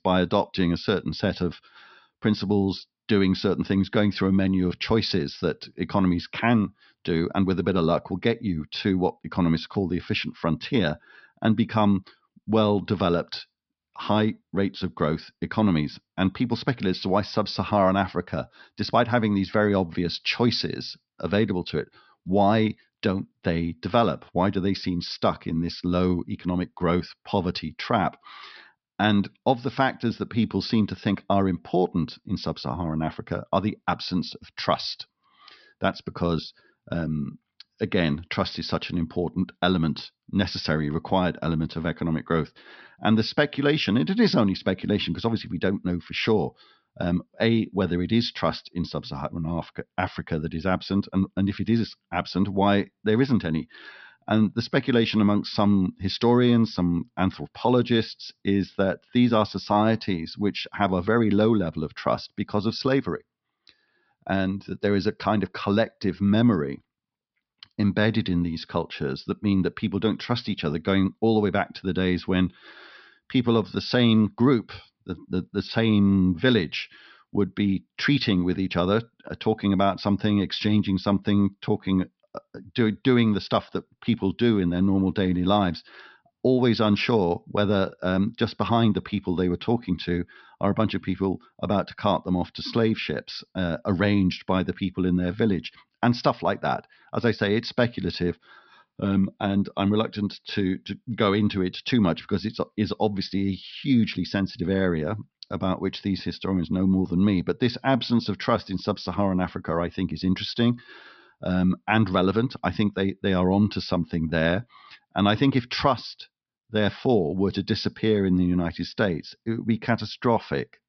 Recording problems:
high frequencies cut off; noticeable; nothing above 5.5 kHz

